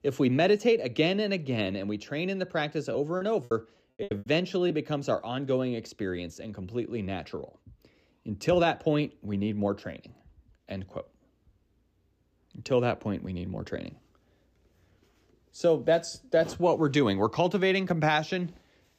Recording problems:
choppy; very; from 3 to 4.5 s; 17% of the speech affected

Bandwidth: 15 kHz